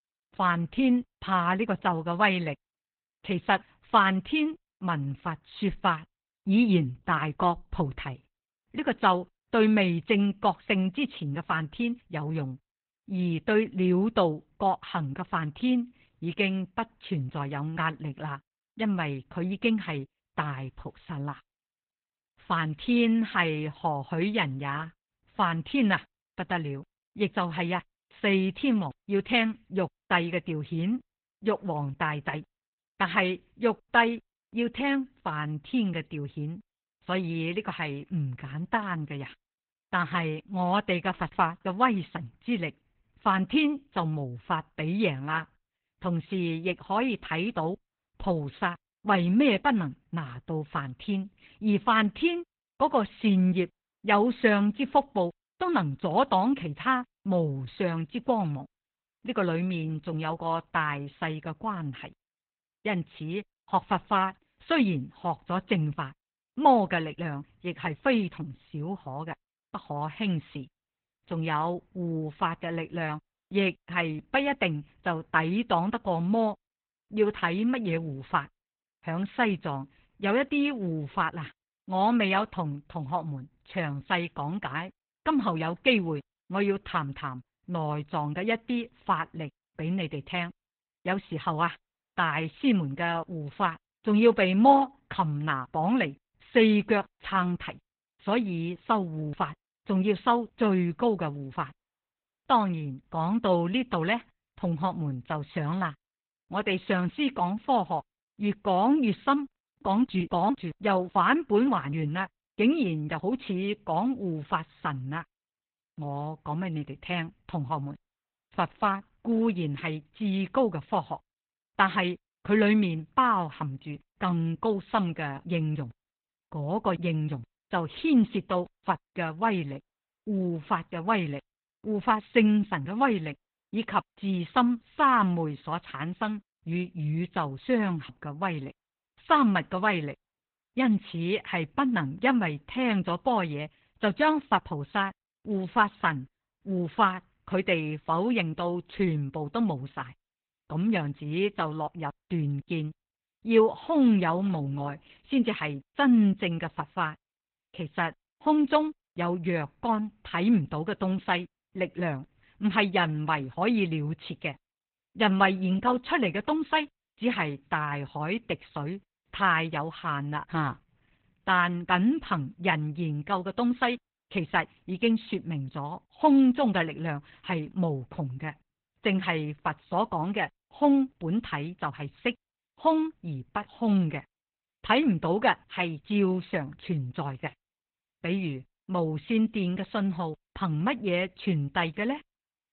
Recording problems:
garbled, watery; badly

